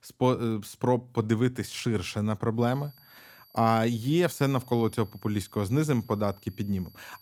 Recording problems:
high-pitched whine; faint; from 2.5 s on; 4.5 kHz, 25 dB below the speech

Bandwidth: 19 kHz